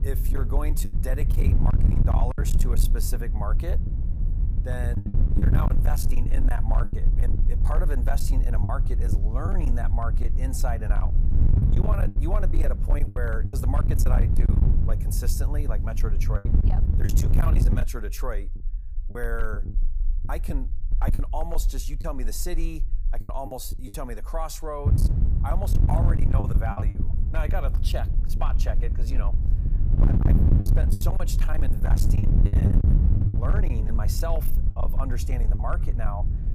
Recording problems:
distortion; slight; 15% of the sound clipped
wind noise on the microphone; heavy; until 18 s and from 25 s on; 4 dB below the speech
low rumble; noticeable; throughout; 15 dB below the speech
choppy; very; 6% of the speech affected

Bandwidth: 15 kHz